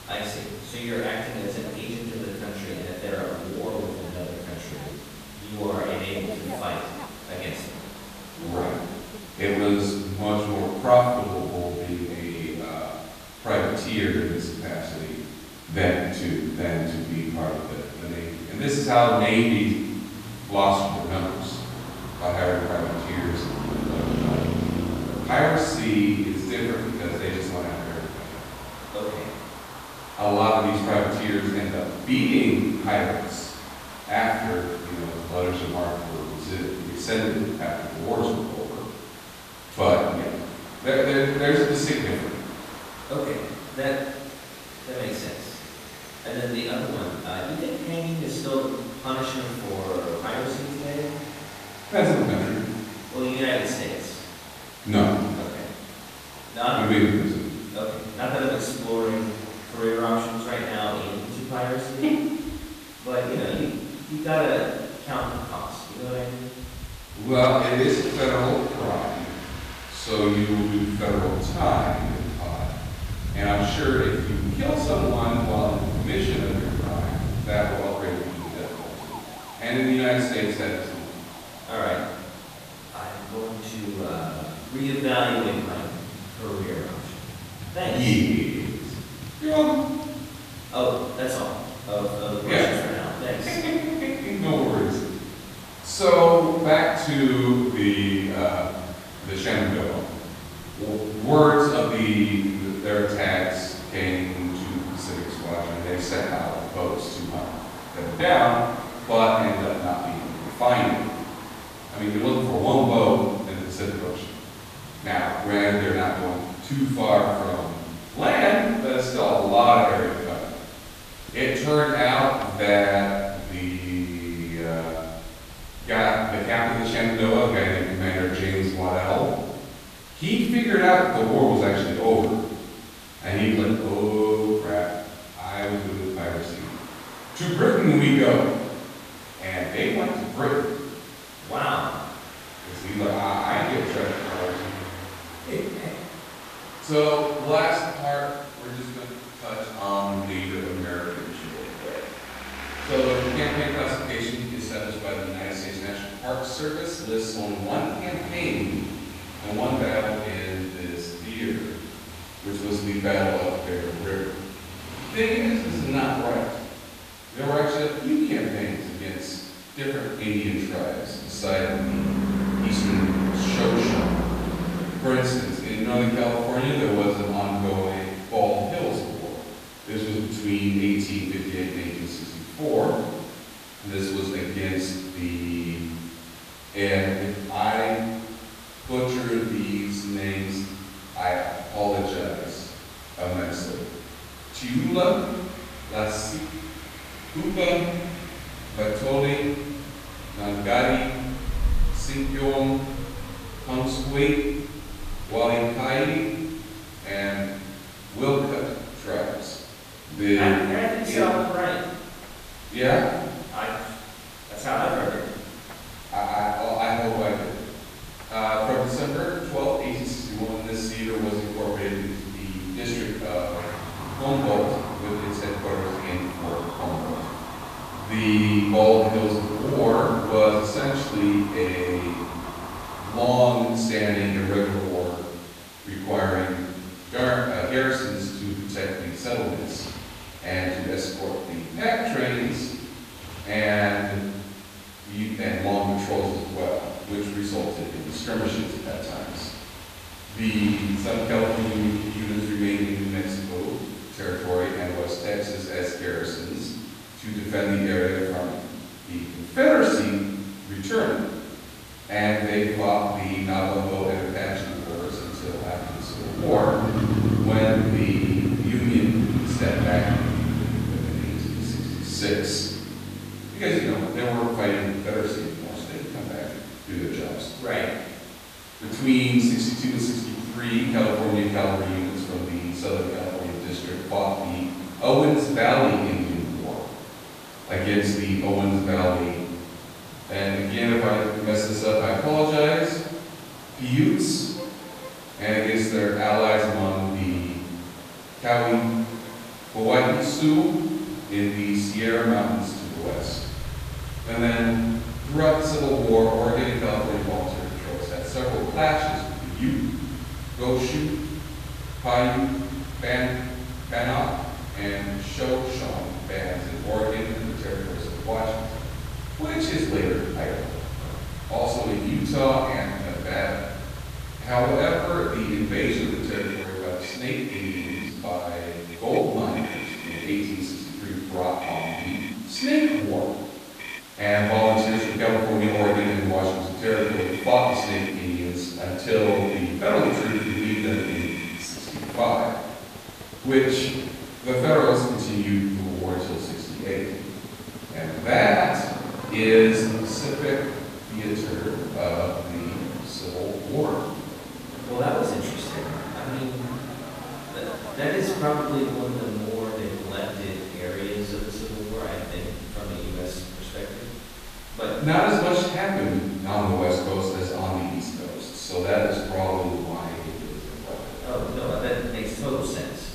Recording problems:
room echo; strong; dies away in 1.1 s
off-mic speech; far
traffic noise; noticeable; throughout; 10 dB below the speech
hiss; noticeable; throughout; 15 dB below the speech

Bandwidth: 14.5 kHz